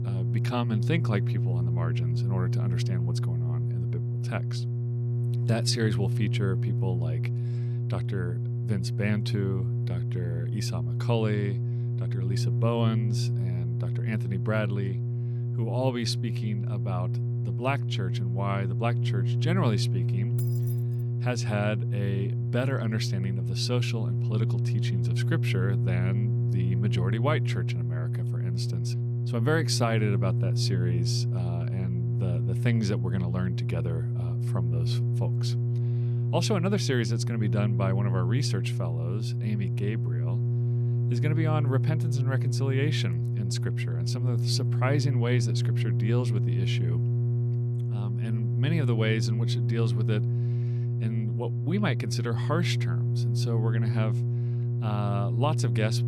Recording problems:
electrical hum; loud; throughout; 60 Hz, 5 dB below the speech
jangling keys; noticeable; at 20 s; peak 10 dB below the speech

